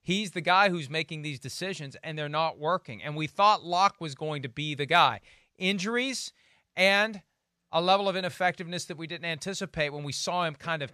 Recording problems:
none

